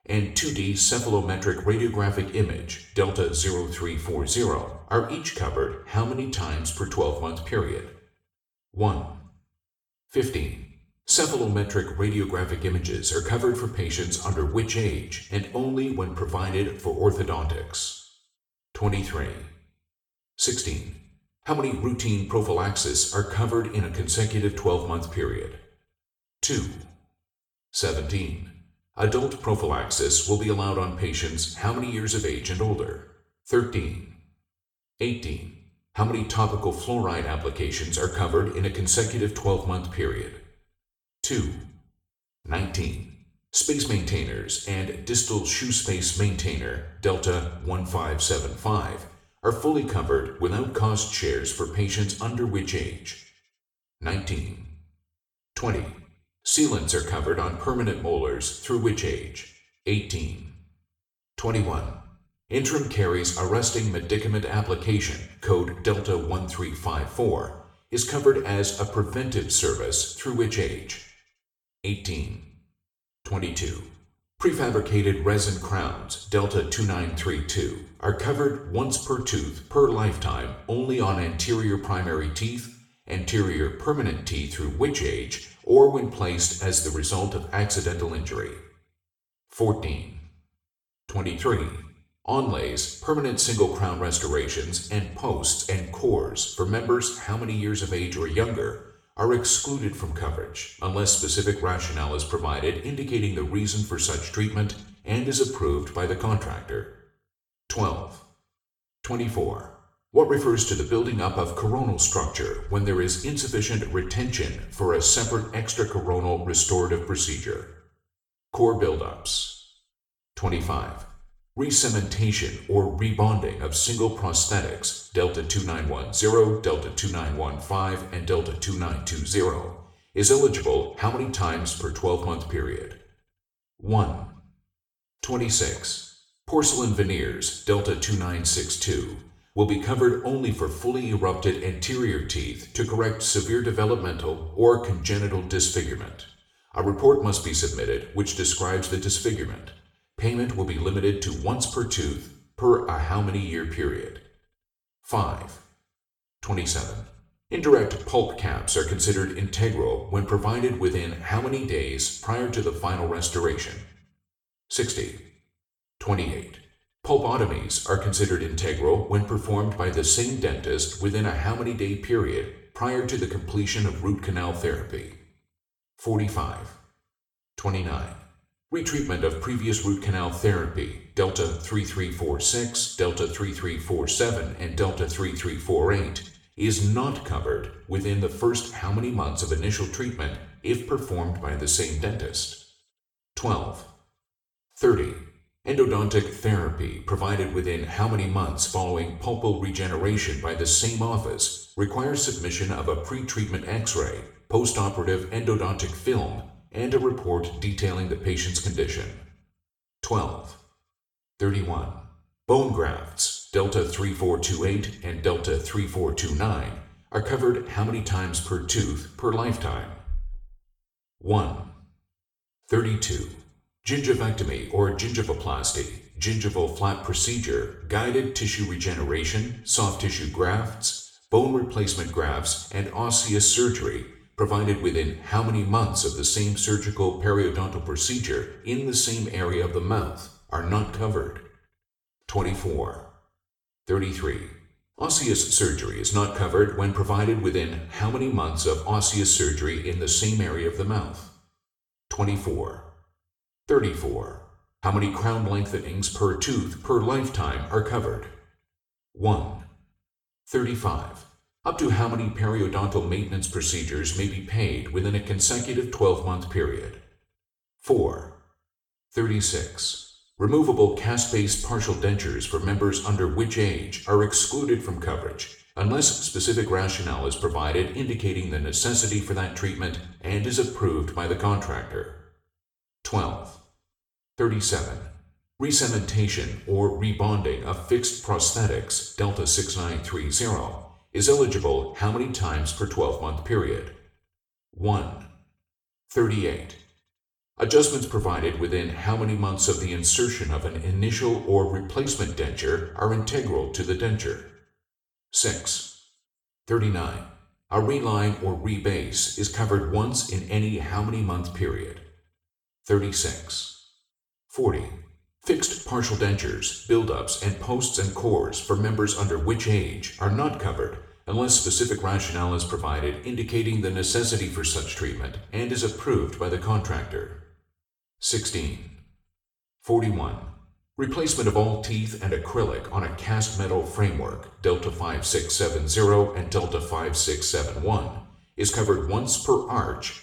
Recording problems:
off-mic speech; far
room echo; slight; dies away in 0.6 s

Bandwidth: 18.5 kHz